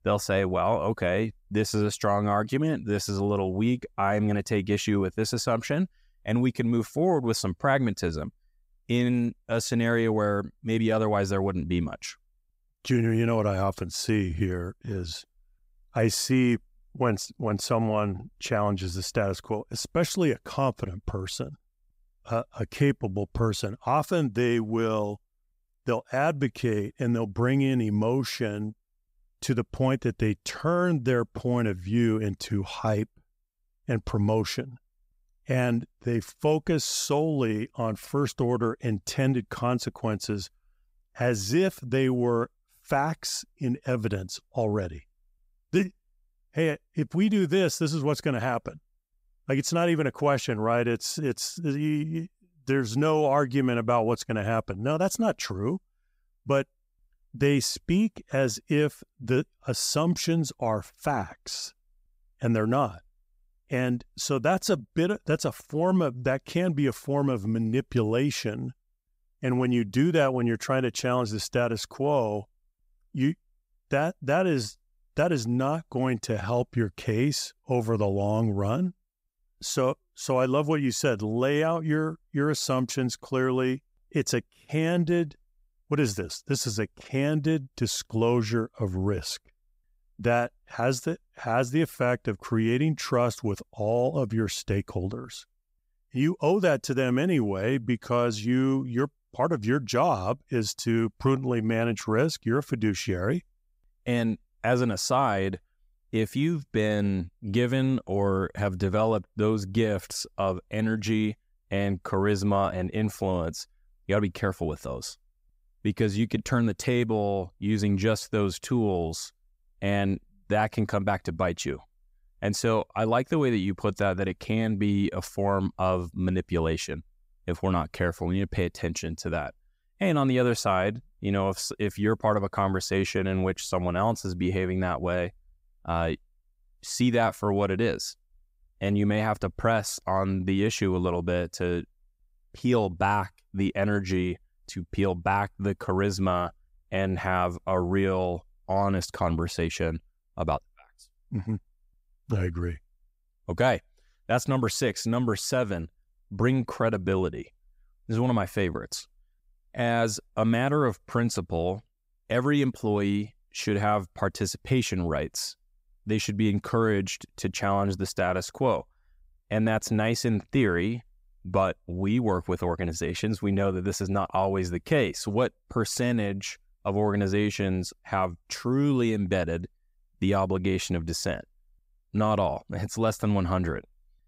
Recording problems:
none

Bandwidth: 15.5 kHz